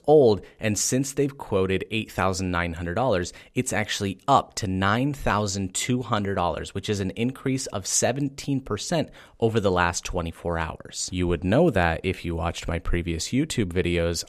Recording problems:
none

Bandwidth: 14.5 kHz